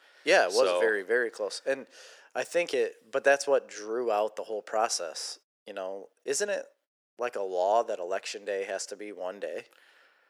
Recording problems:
thin; very; fading below 450 Hz

